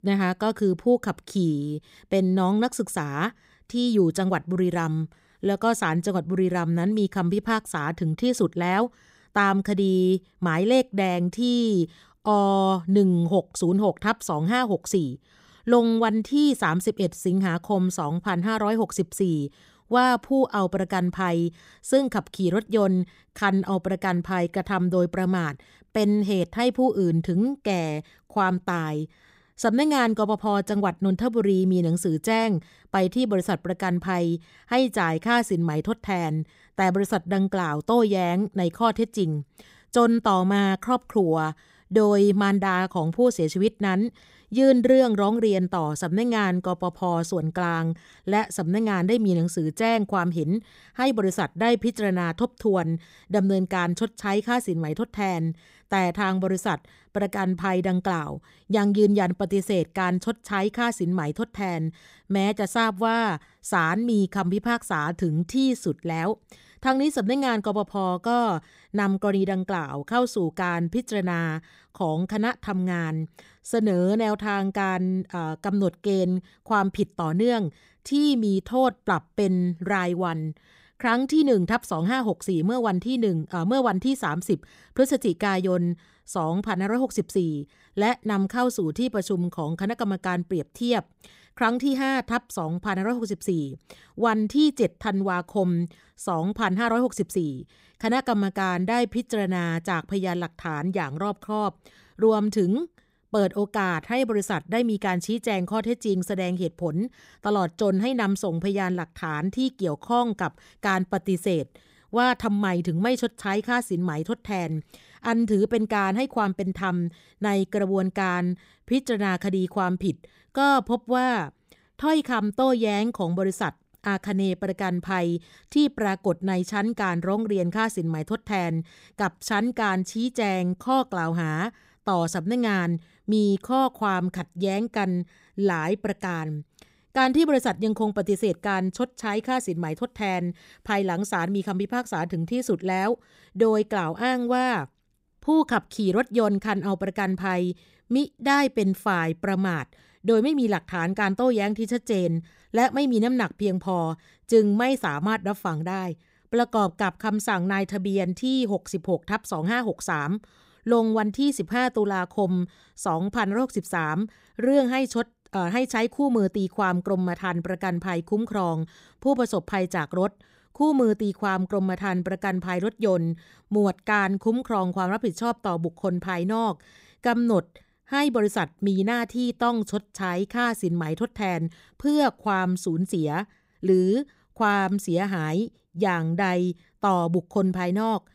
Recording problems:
none

